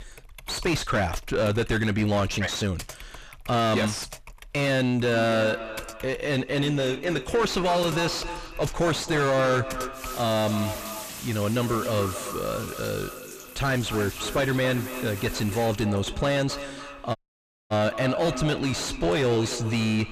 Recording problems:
distortion; heavy; 6 dB below the speech
echo of what is said; strong; from 5 s on; 270 ms later, 10 dB below the speech
household noises; noticeable; throughout; 15 dB below the speech
audio cutting out; at 17 s for 0.5 s

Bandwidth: 14.5 kHz